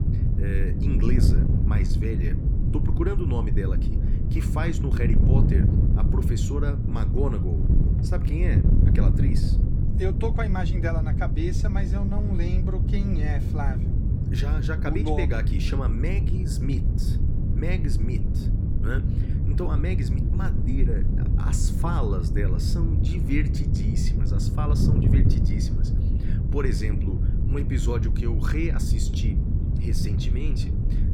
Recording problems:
wind noise on the microphone; heavy; 2 dB below the speech

